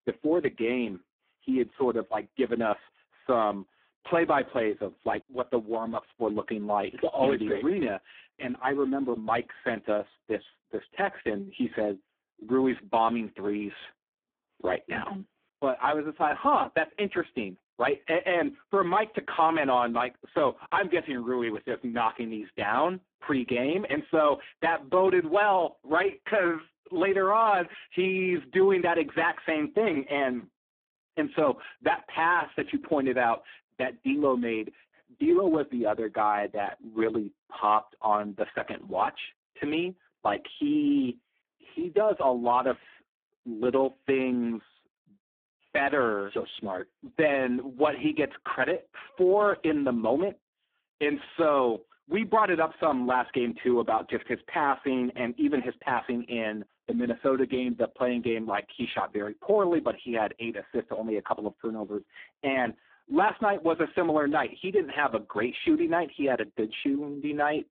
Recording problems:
phone-call audio; poor line

